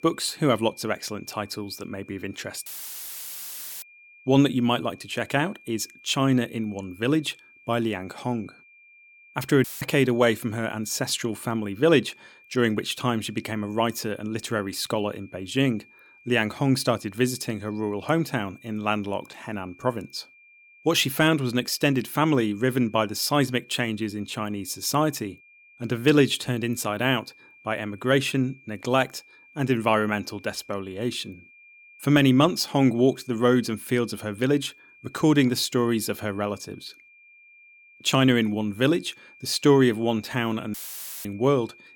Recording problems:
high-pitched whine; faint; throughout; 2.5 kHz, 25 dB below the speech
audio cutting out; filled with static; at 2.5 s for 1 s, at 9.5 s and at 41 s for 0.5 s

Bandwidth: 17.5 kHz